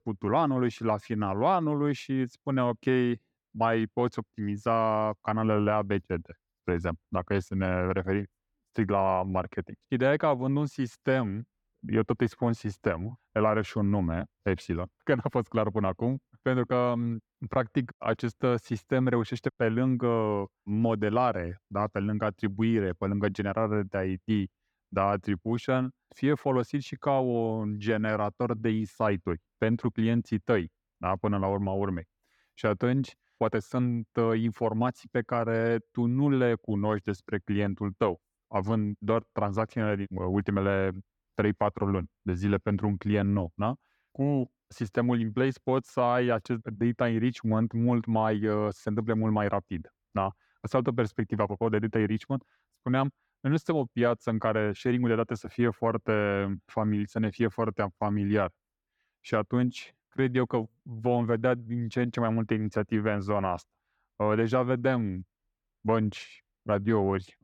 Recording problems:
muffled; slightly; fading above 4 kHz

